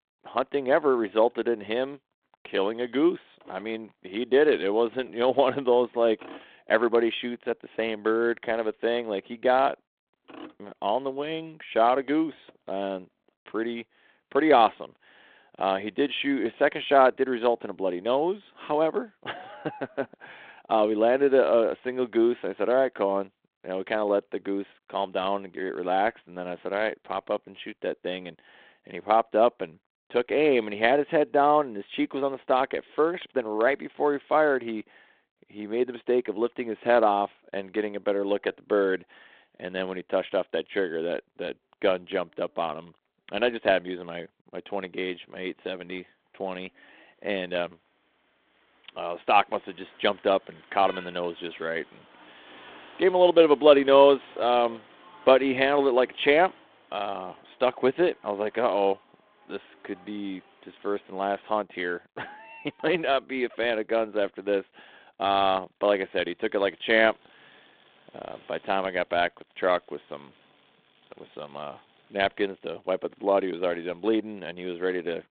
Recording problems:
phone-call audio
traffic noise; faint; throughout; 25 dB below the speech

